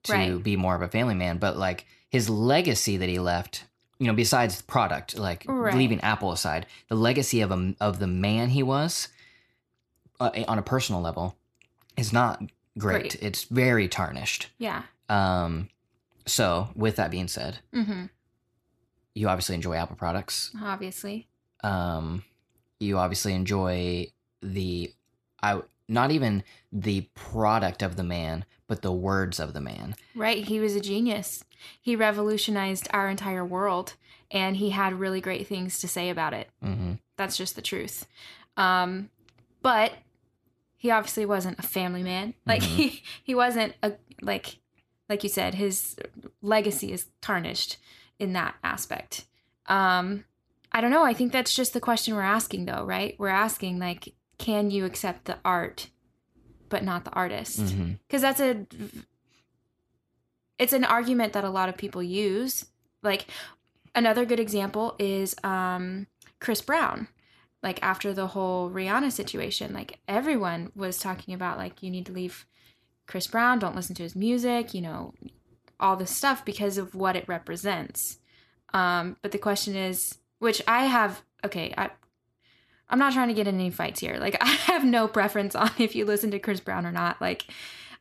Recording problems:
none

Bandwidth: 13.5 kHz